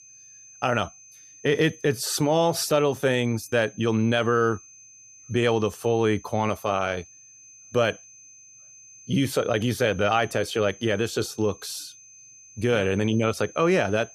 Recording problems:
high-pitched whine; faint; throughout; 6.5 kHz, 20 dB below the speech

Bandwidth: 14.5 kHz